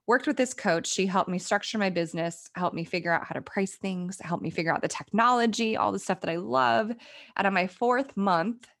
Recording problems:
none

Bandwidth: 17 kHz